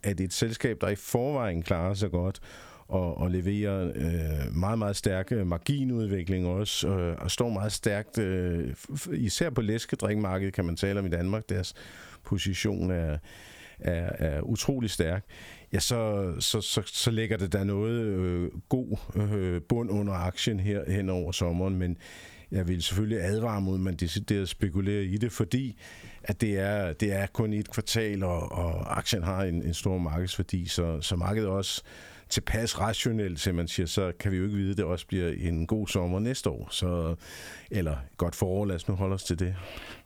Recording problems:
squashed, flat; somewhat

